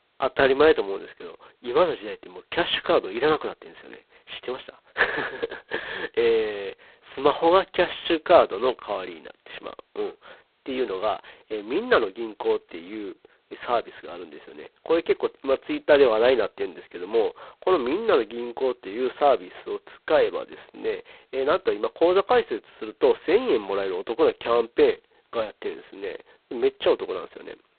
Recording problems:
phone-call audio; poor line; nothing above 4 kHz

